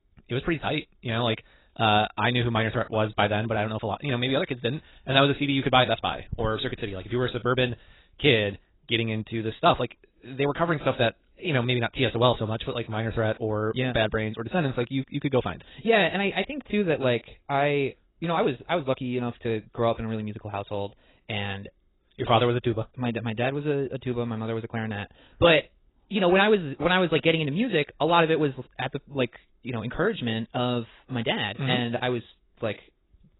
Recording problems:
garbled, watery; badly; nothing above 4 kHz
wrong speed, natural pitch; too fast; 1.5 times normal speed

